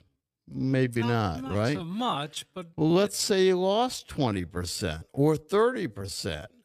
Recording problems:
wrong speed, natural pitch; too slow; 0.6 times normal speed

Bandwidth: 14.5 kHz